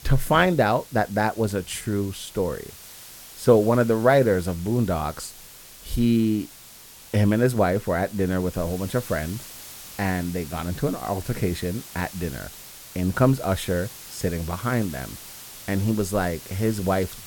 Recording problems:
hiss; noticeable; throughout; 15 dB below the speech

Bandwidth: 17 kHz